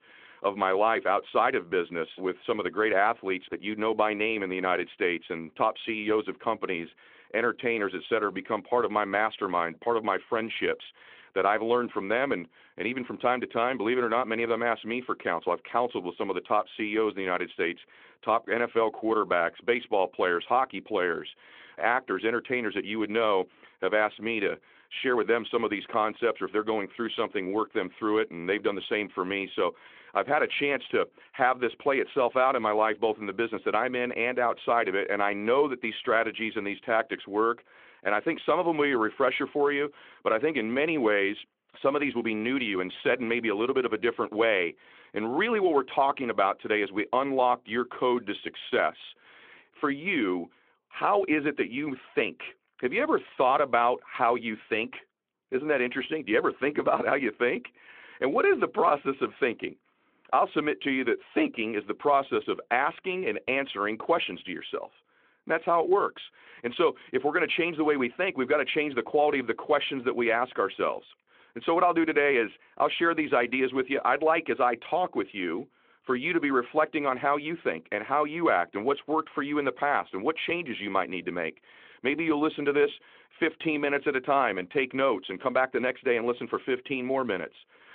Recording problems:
phone-call audio

